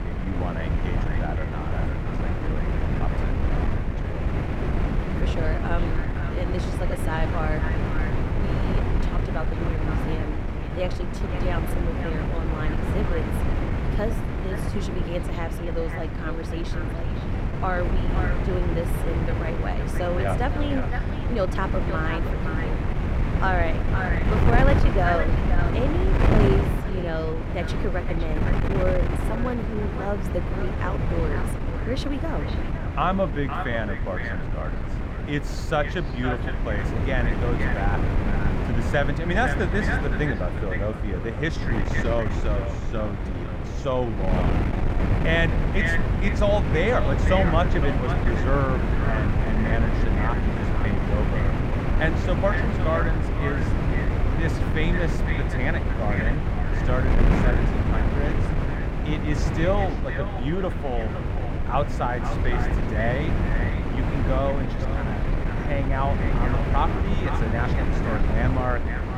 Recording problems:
echo of what is said; strong; throughout; 510 ms later, 8 dB below the speech
muffled; slightly; fading above 3 kHz
wind noise on the microphone; heavy; 3 dB below the speech

